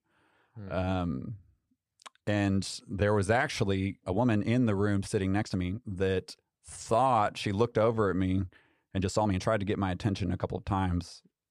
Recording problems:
uneven, jittery; strongly; from 0.5 to 11 s

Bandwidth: 15 kHz